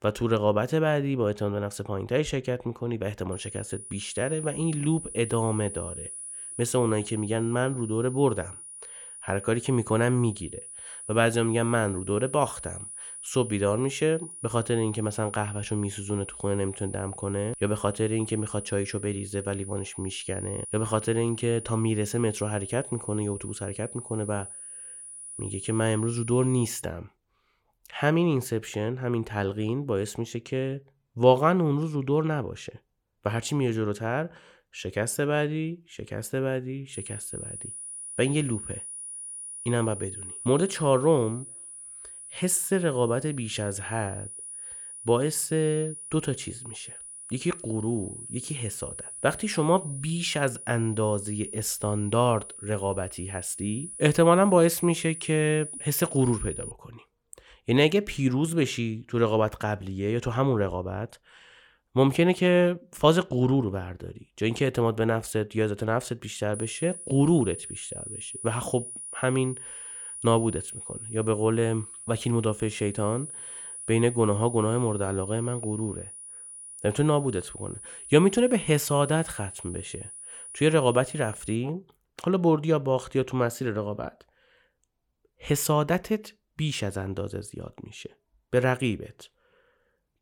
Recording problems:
high-pitched whine; noticeable; from 3.5 to 27 s, from 37 to 57 s and from 1:07 to 1:22; 10 kHz, 10 dB below the speech

